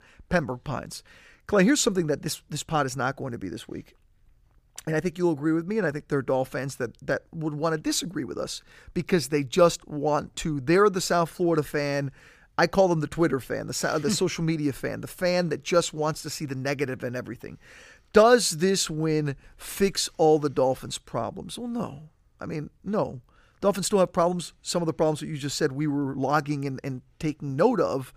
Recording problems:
none

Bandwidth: 15 kHz